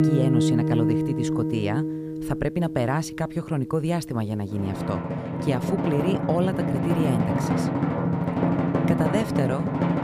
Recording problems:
background music; very loud; throughout; 2 dB above the speech

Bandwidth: 14.5 kHz